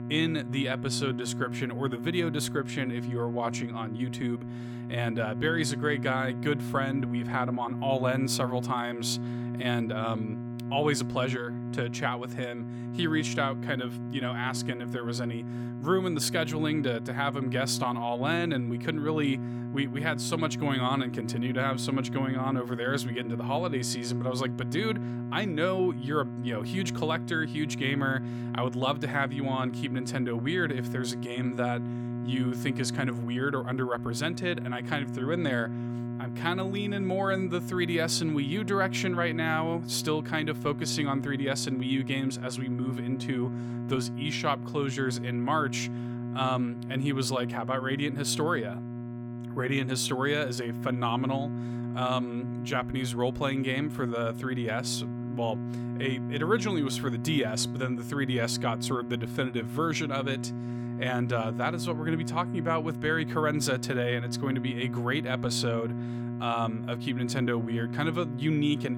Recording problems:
electrical hum; noticeable; throughout; 60 Hz, 10 dB below the speech

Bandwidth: 18 kHz